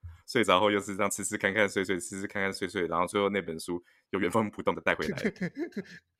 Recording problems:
uneven, jittery; strongly; from 1 to 5.5 s

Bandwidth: 16 kHz